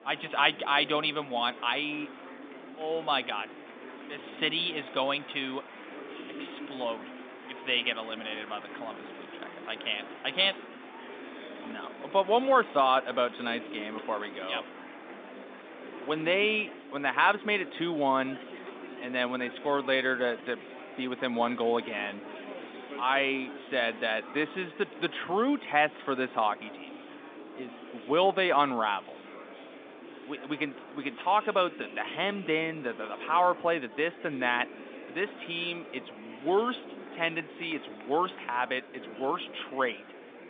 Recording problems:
phone-call audio; nothing above 3.5 kHz
murmuring crowd; noticeable; throughout; 15 dB below the speech

